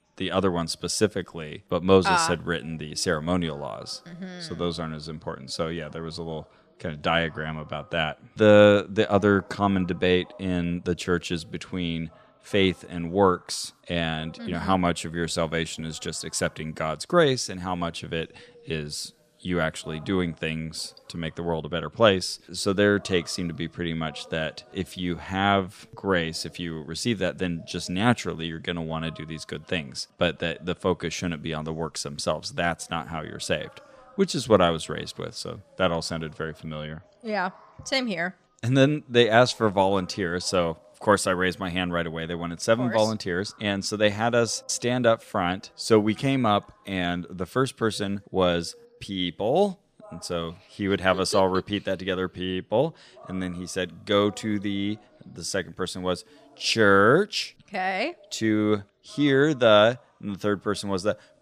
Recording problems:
background chatter; faint; throughout; 3 voices, 30 dB below the speech

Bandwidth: 14.5 kHz